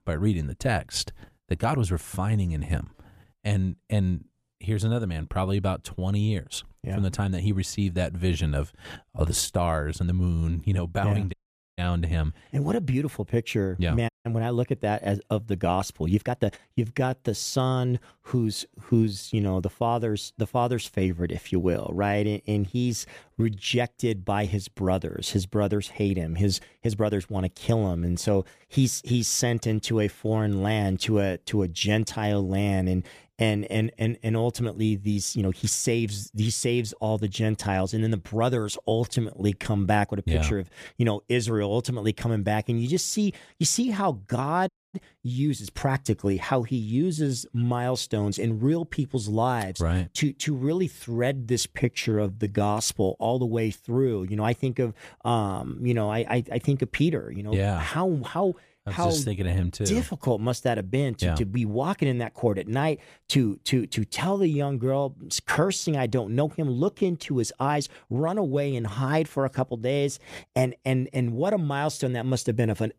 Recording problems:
uneven, jittery; strongly; from 4 s to 1:09
audio cutting out; at 11 s, at 14 s and at 45 s

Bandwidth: 14.5 kHz